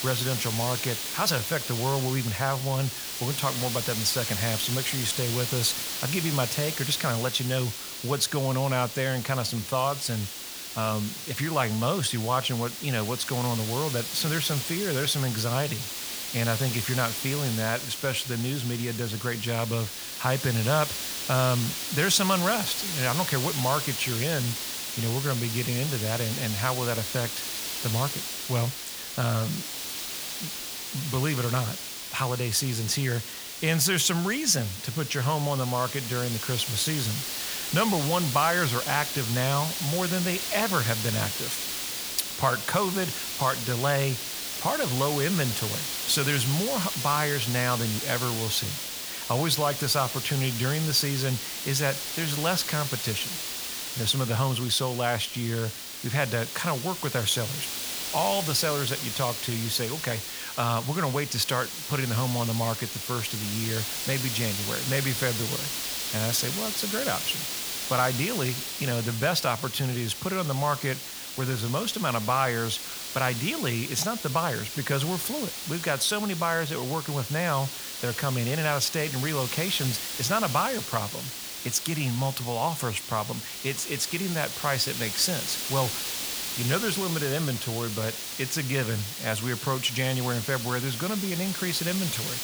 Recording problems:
hiss; loud; throughout; 3 dB below the speech

